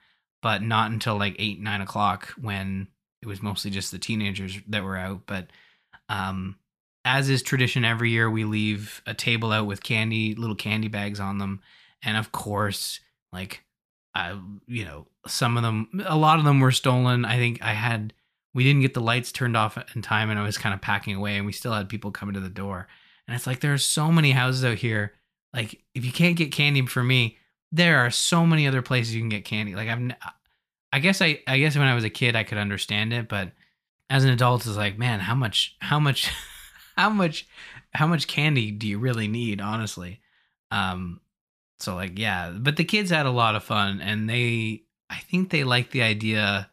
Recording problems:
none

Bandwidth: 14.5 kHz